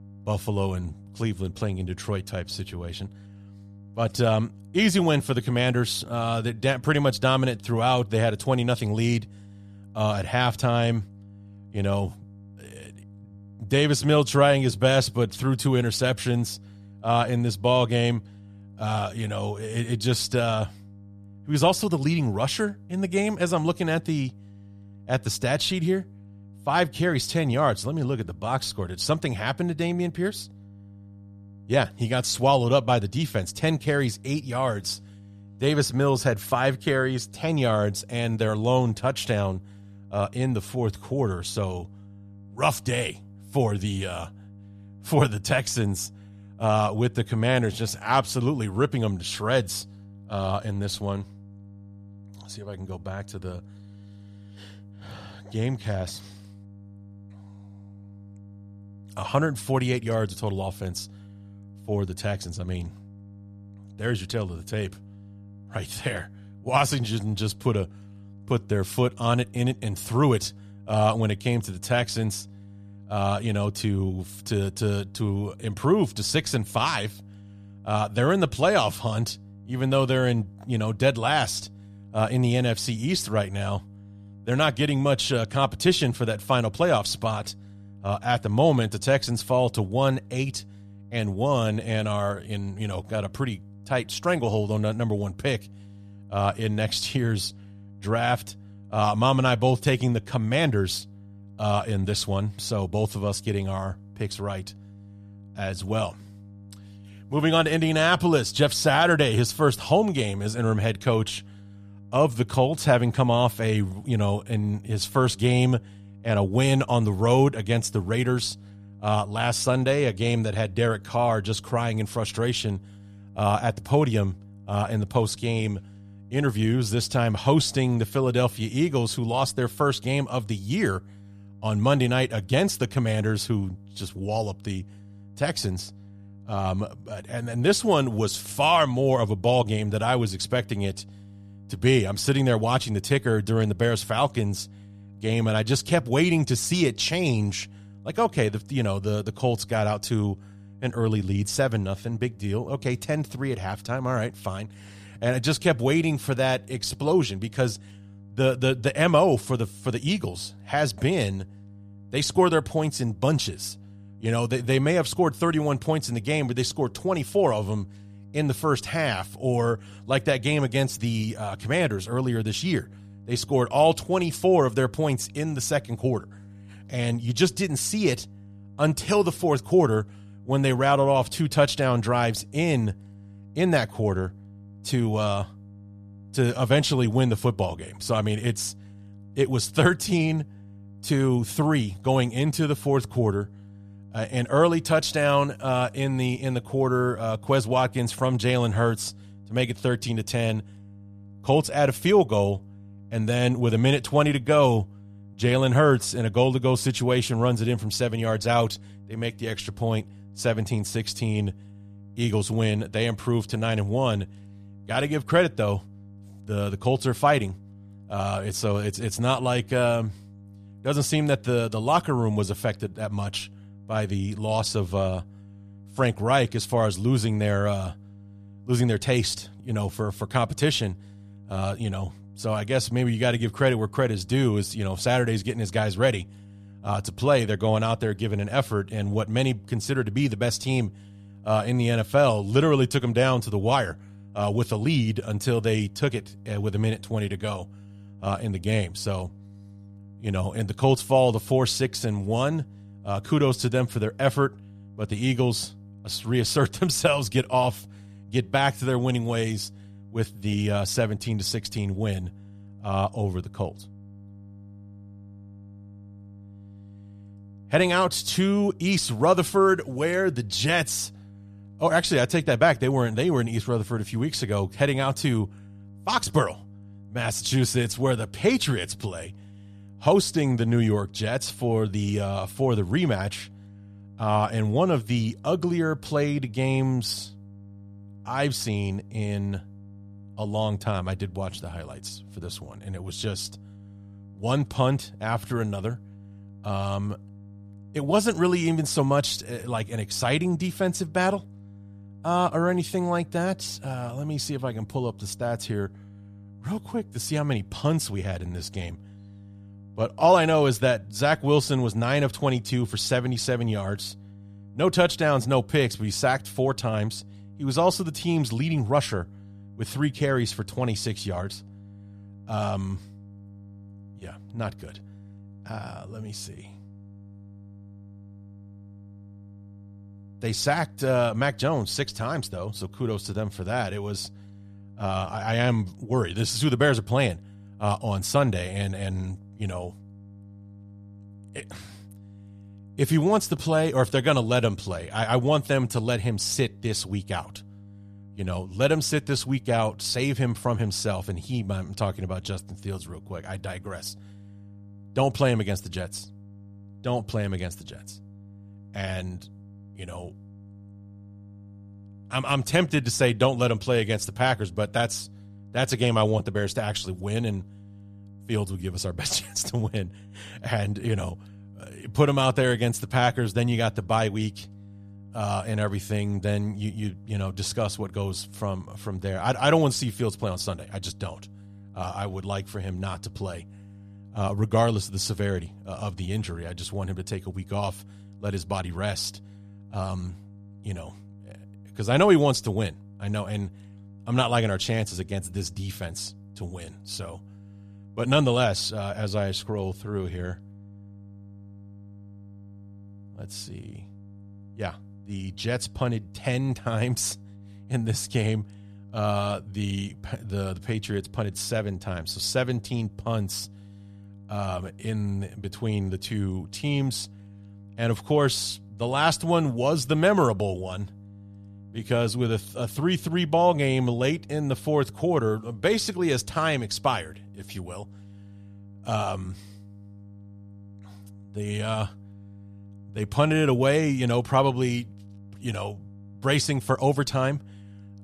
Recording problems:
electrical hum; faint; throughout; 50 Hz, 30 dB below the speech

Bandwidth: 14.5 kHz